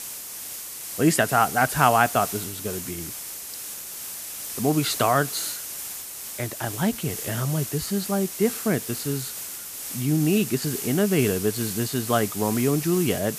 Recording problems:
hiss; loud; throughout; 7 dB below the speech

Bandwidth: 14.5 kHz